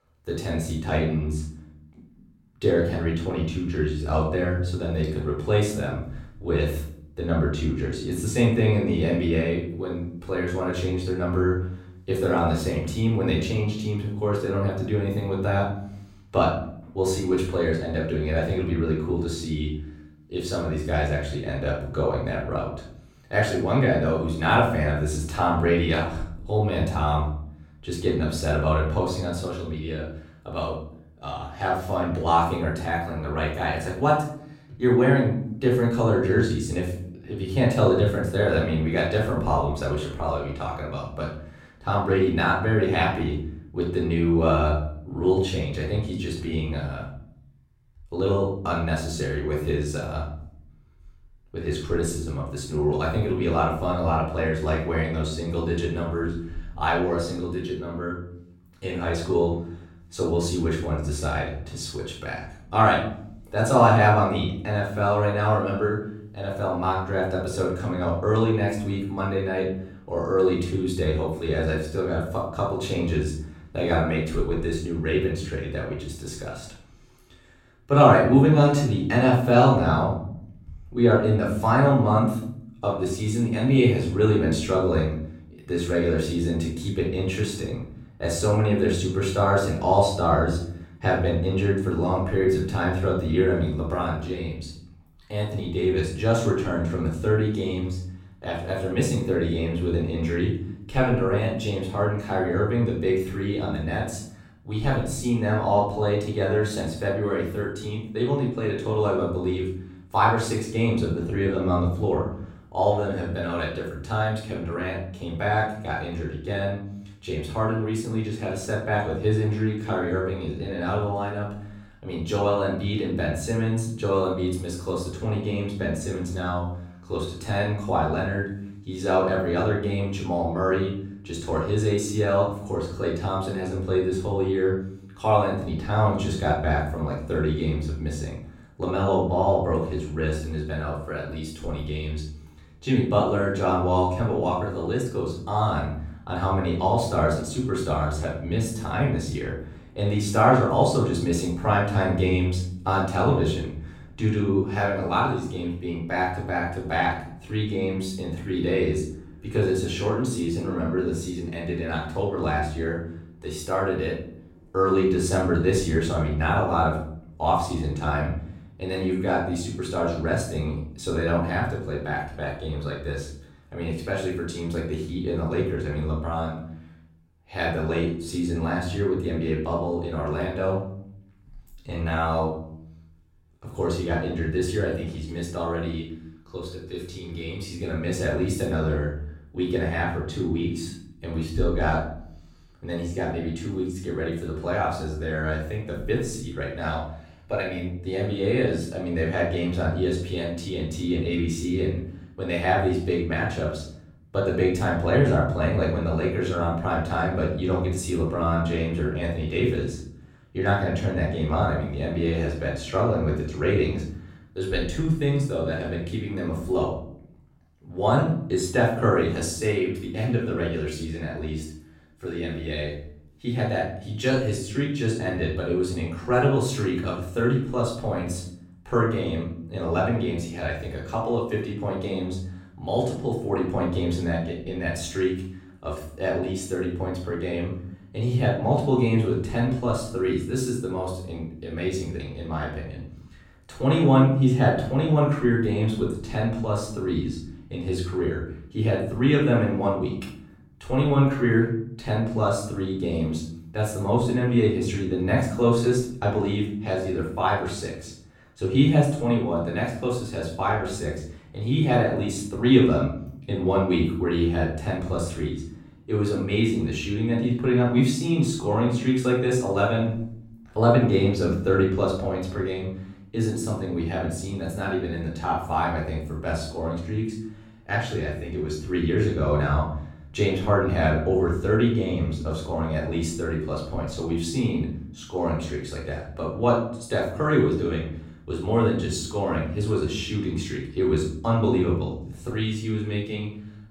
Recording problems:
off-mic speech; far
room echo; noticeable; dies away in 0.7 s

